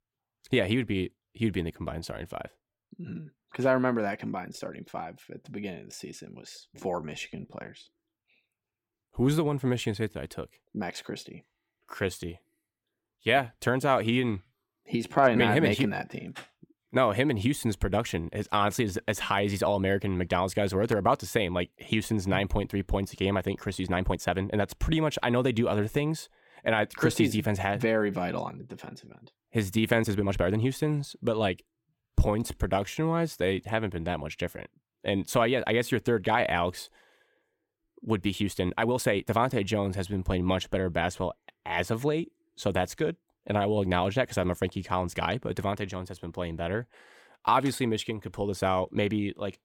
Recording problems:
uneven, jittery; strongly; from 6.5 to 39 s

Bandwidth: 17 kHz